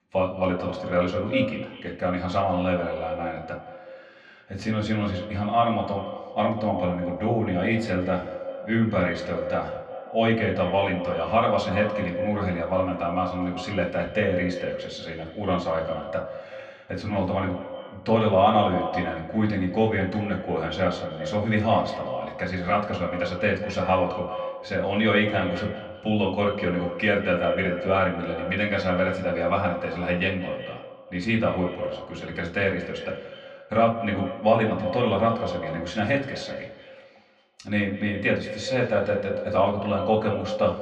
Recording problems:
echo of what is said; strong; throughout; 180 ms later, 9 dB below the speech
off-mic speech; far
muffled; slightly; fading above 3 kHz
room echo; very slight; dies away in 0.3 s

